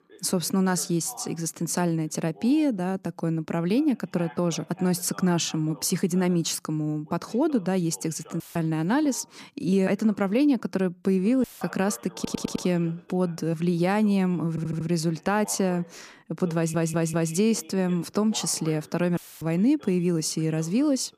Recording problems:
voice in the background; faint; throughout; 25 dB below the speech
audio cutting out; filled with static; at 8.5 s, at 11 s and at 19 s
audio stuttering; at 12 s, at 15 s and at 17 s

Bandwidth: 14.5 kHz